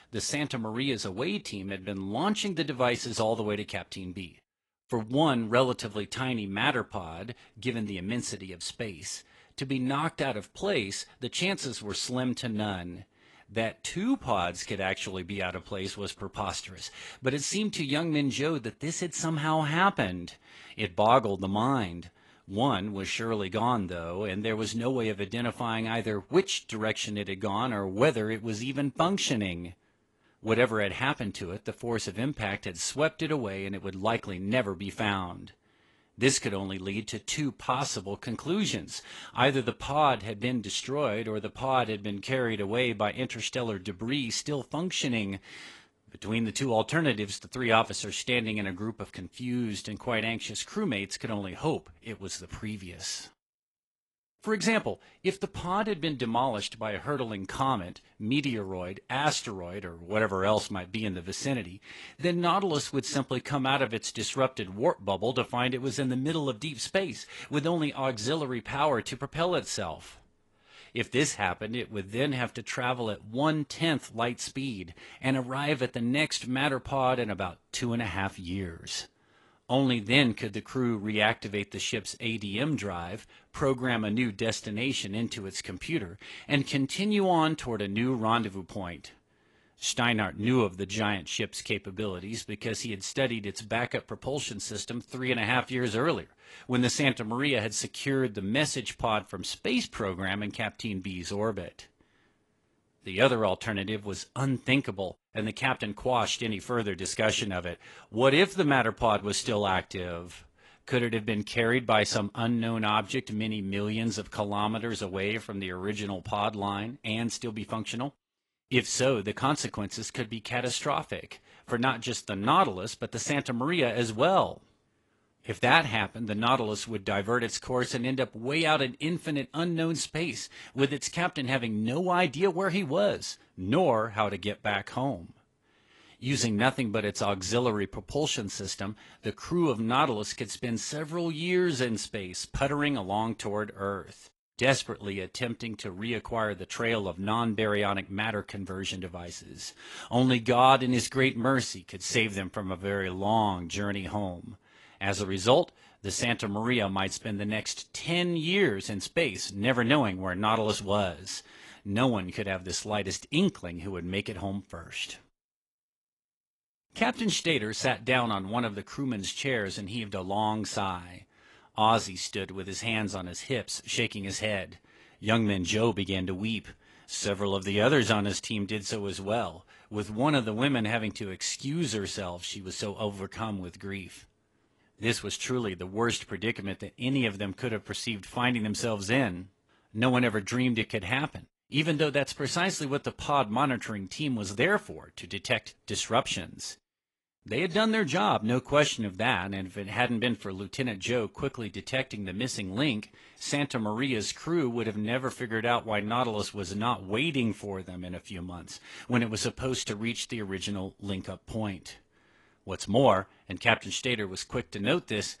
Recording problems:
garbled, watery; slightly; nothing above 11.5 kHz

